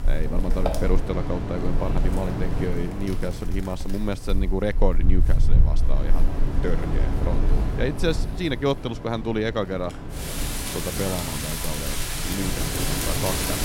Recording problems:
wind in the background; very loud; throughout; 2 dB above the speech

